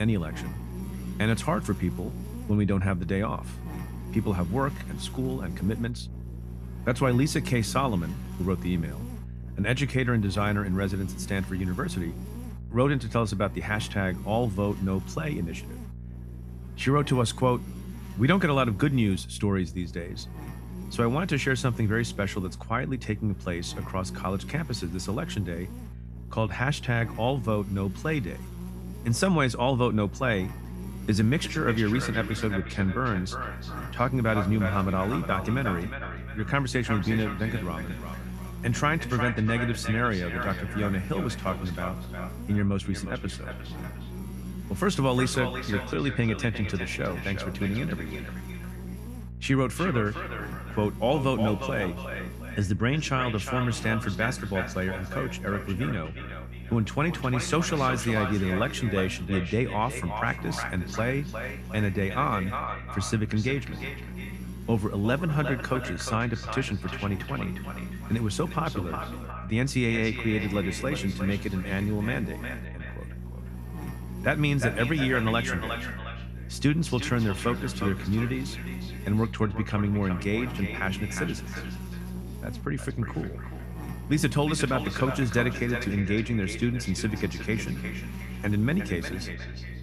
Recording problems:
echo of what is said; strong; from 31 s on; 360 ms later, 9 dB below the speech
electrical hum; noticeable; throughout; 60 Hz, 15 dB below the speech
abrupt cut into speech; at the start

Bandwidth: 14.5 kHz